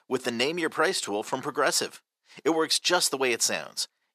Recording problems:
thin; very; fading below 550 Hz

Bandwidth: 14.5 kHz